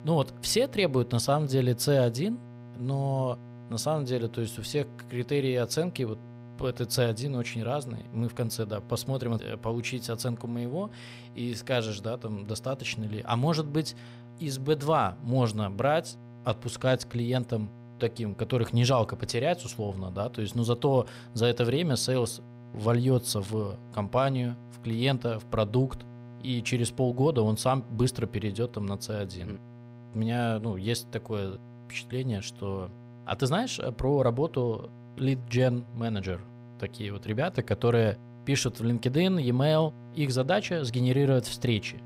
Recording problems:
electrical hum; faint; throughout; 60 Hz, 20 dB below the speech

